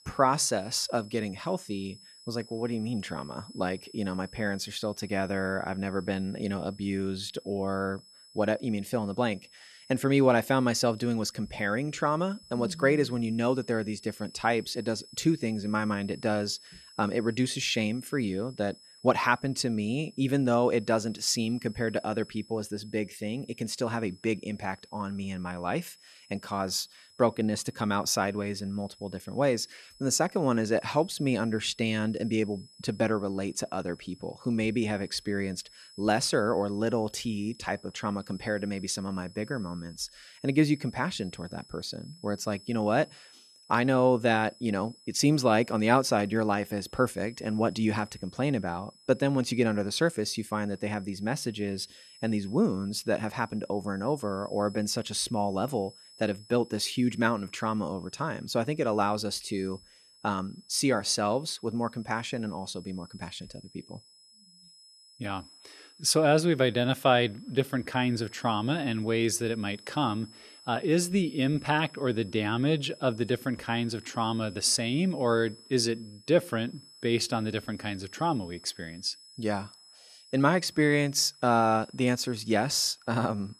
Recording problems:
high-pitched whine; faint; throughout; 5 kHz, 25 dB below the speech

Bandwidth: 13.5 kHz